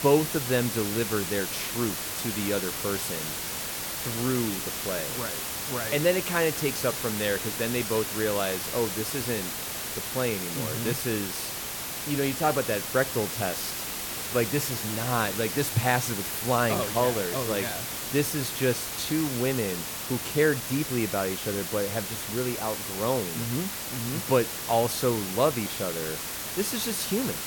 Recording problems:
hiss; loud; throughout; 2 dB below the speech

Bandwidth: 17.5 kHz